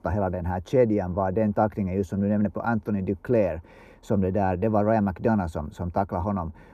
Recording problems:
muffled; very; fading above 1.5 kHz

